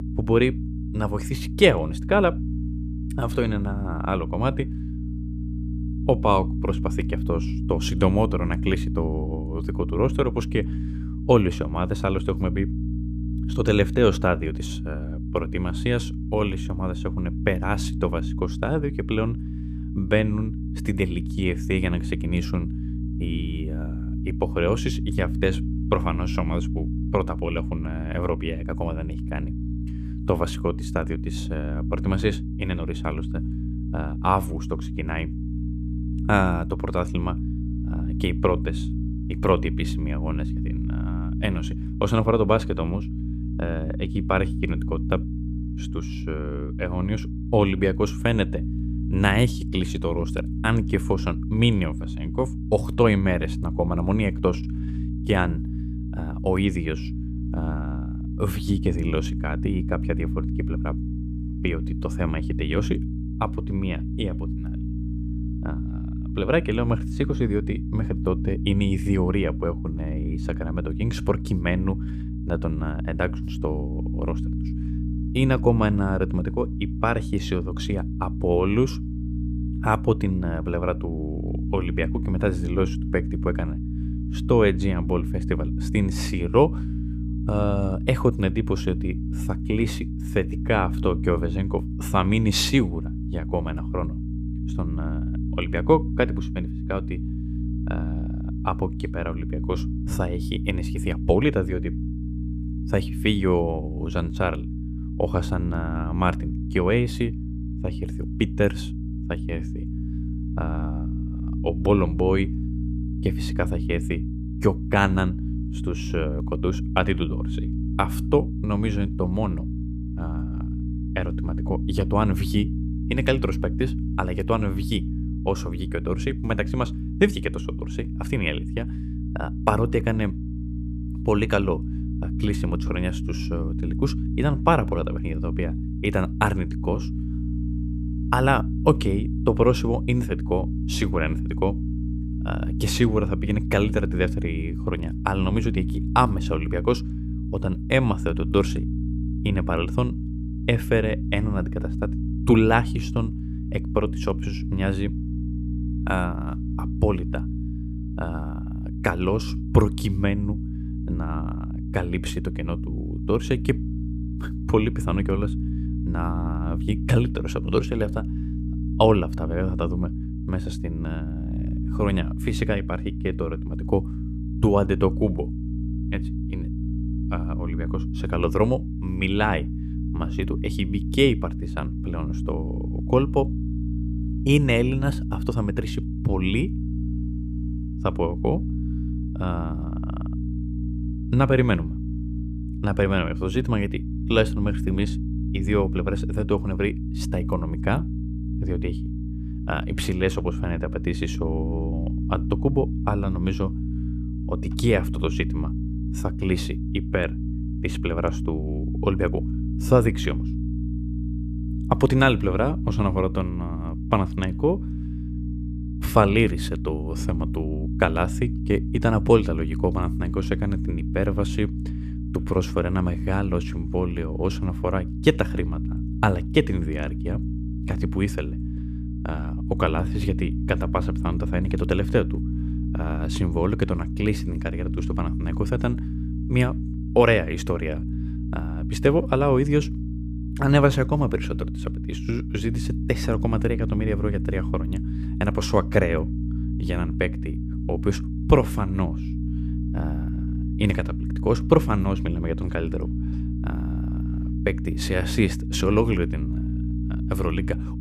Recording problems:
electrical hum; noticeable; throughout; 60 Hz, 10 dB below the speech

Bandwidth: 14.5 kHz